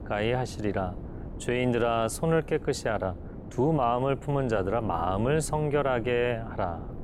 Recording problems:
wind noise on the microphone; occasional gusts; 20 dB below the speech

